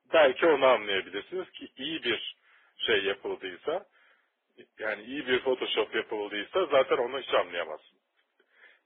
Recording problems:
phone-call audio; poor line; nothing above 3.5 kHz
garbled, watery; badly
distortion; slight; 3% of the sound clipped

